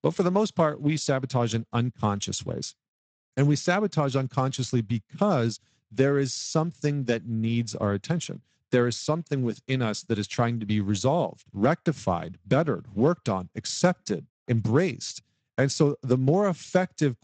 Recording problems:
garbled, watery; slightly; nothing above 8 kHz

